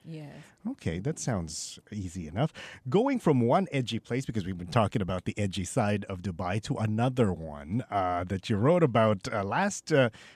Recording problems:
none

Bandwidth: 14 kHz